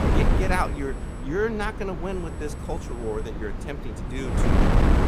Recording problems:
wind noise on the microphone; heavy; 3 dB below the speech
high-pitched whine; faint; until 1 s, from 2 to 3.5 s and at 4 s; 8 kHz, 25 dB below the speech

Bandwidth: 15 kHz